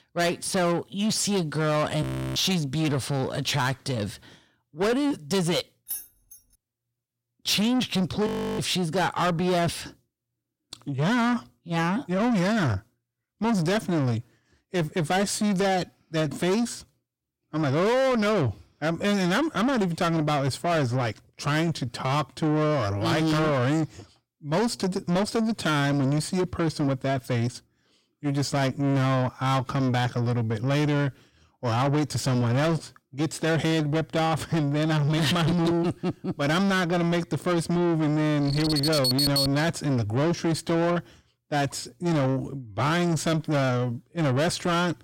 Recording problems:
distortion; heavy; 8 dB below the speech
audio freezing; at 2 s and at 8.5 s
jangling keys; noticeable; at 6 s; peak 9 dB below the speech
alarm; loud; from 38 to 40 s; peak 6 dB above the speech

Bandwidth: 16.5 kHz